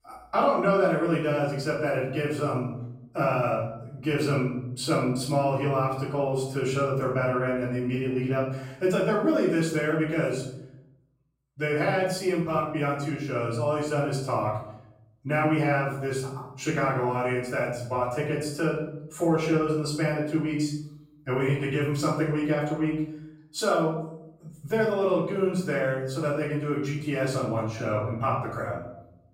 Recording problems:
off-mic speech; far
room echo; noticeable; dies away in 0.7 s

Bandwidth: 16 kHz